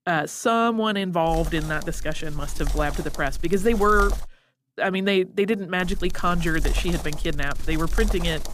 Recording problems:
wind noise on the microphone; occasional gusts; from 1.5 to 4 s and from 6 s on; 15 dB below the speech

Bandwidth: 15 kHz